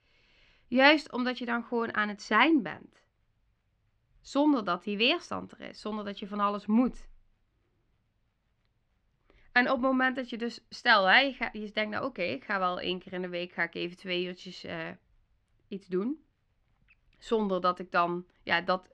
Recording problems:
muffled; slightly; fading above 2.5 kHz

